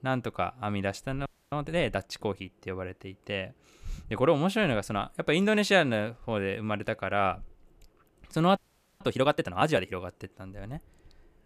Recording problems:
audio freezing; at 1.5 s and at 8.5 s

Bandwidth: 14.5 kHz